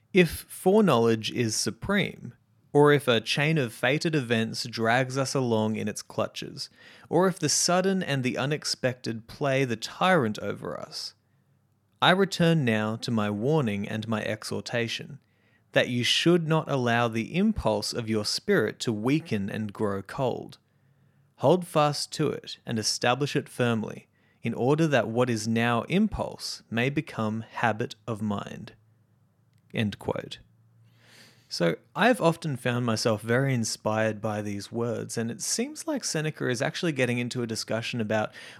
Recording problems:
none

